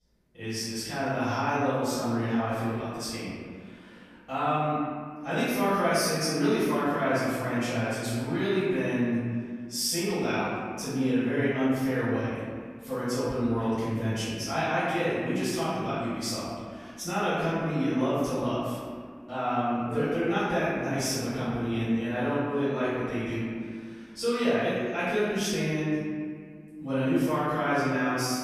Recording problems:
room echo; strong; dies away in 1.9 s
off-mic speech; far

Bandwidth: 14.5 kHz